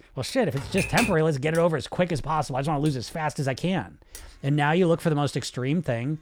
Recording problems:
household noises; faint; throughout; 25 dB below the speech
keyboard typing; noticeable; at 0.5 s; peak 1 dB below the speech

